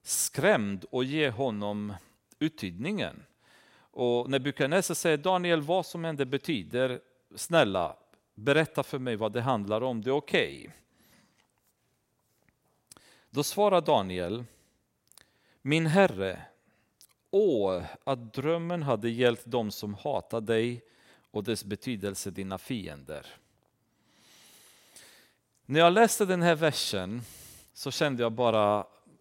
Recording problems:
none

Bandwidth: 16 kHz